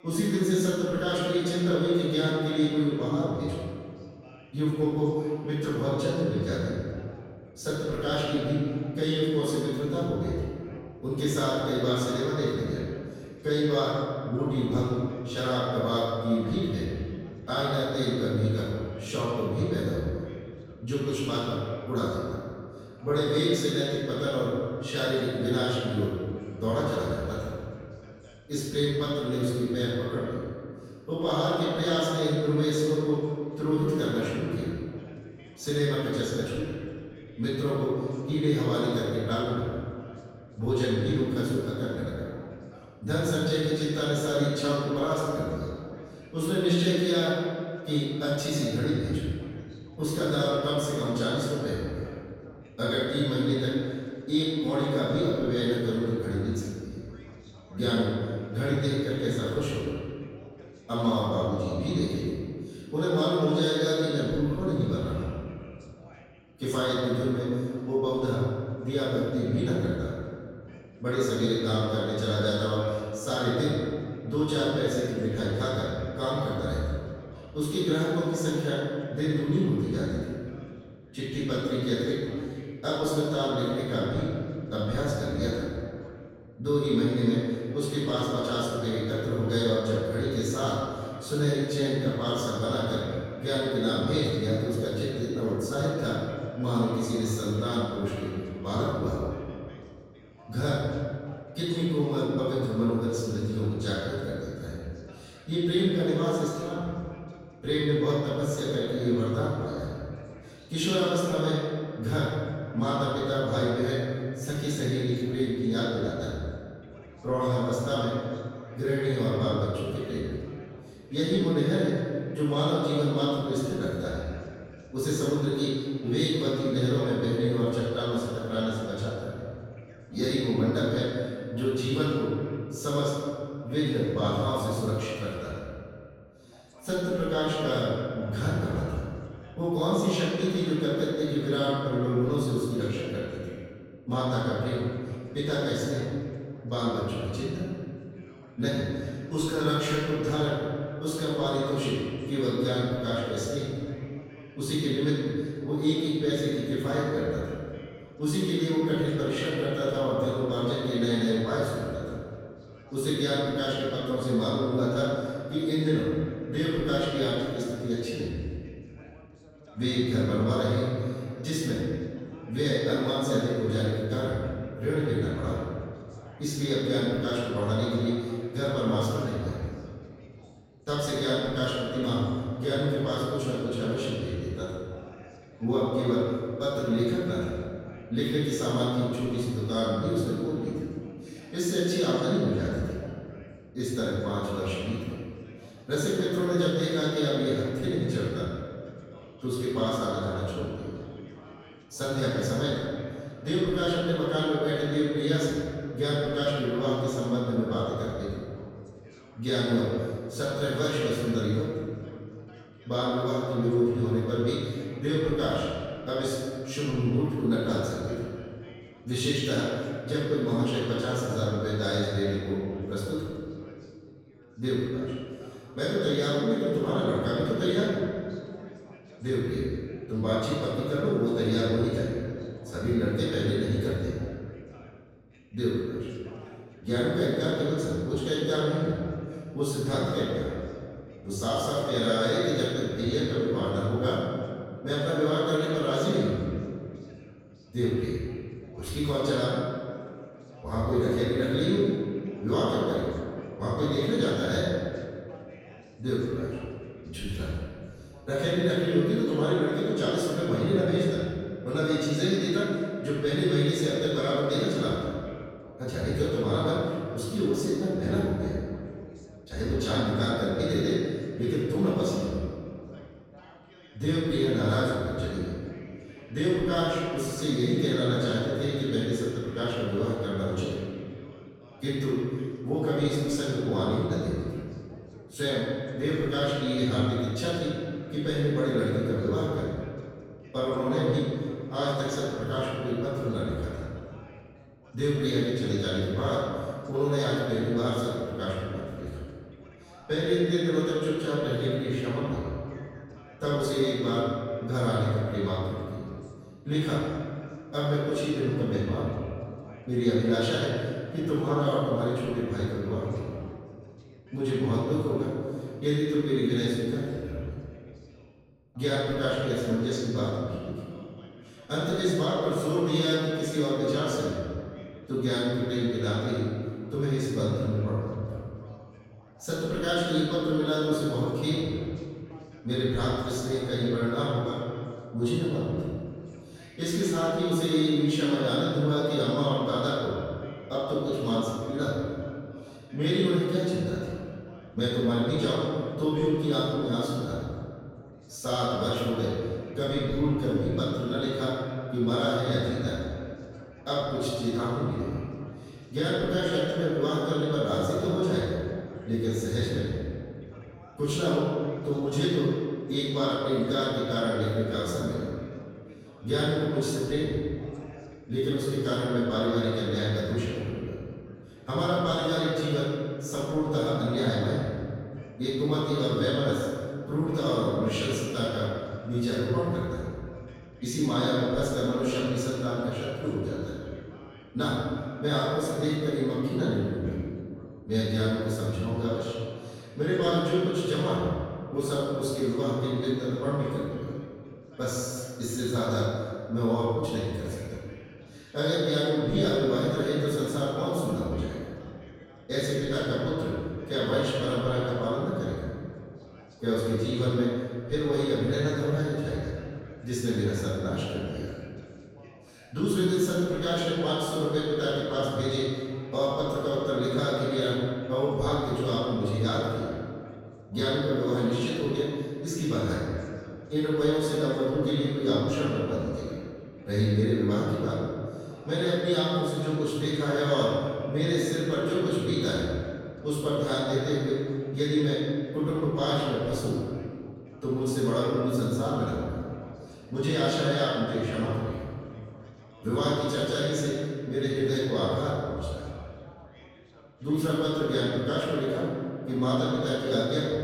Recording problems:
room echo; strong; dies away in 2 s
off-mic speech; far
background chatter; faint; throughout; 2 voices, 25 dB below the speech

